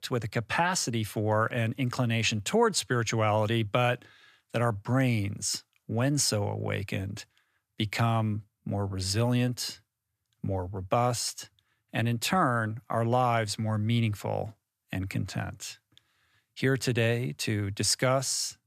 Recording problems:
none

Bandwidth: 14.5 kHz